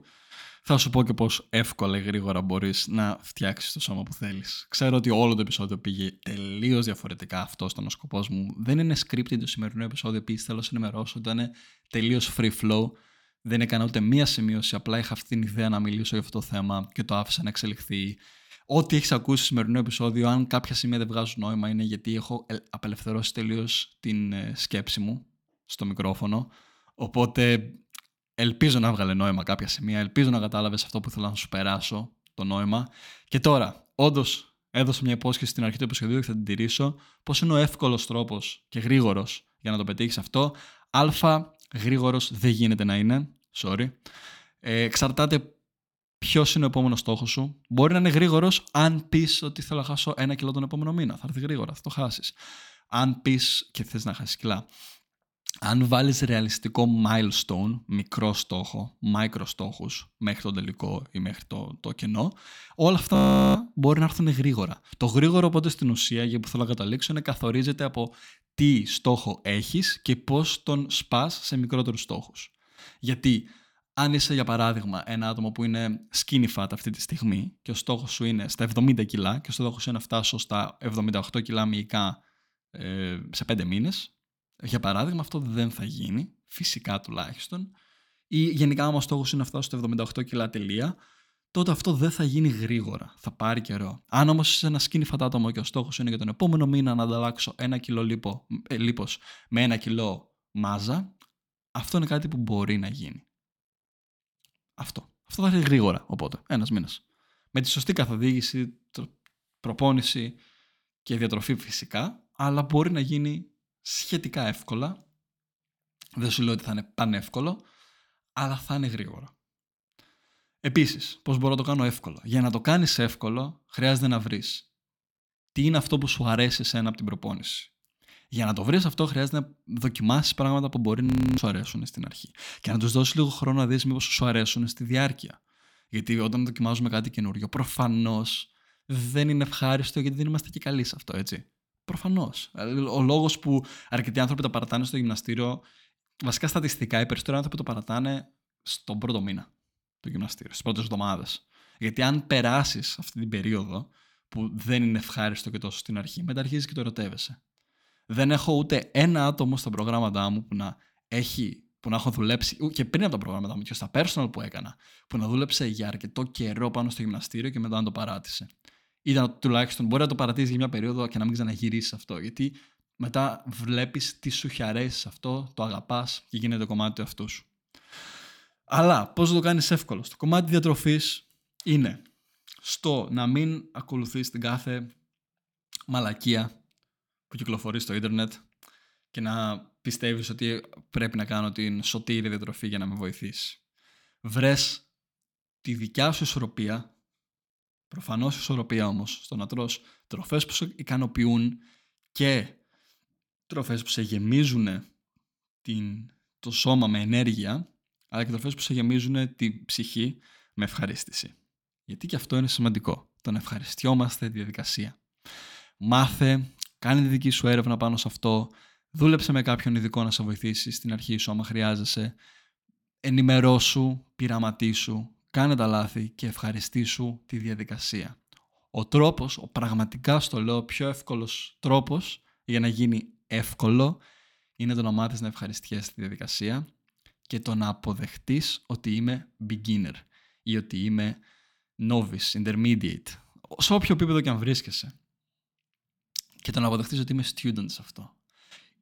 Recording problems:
audio freezing; at 1:03 and at 2:11

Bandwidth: 18 kHz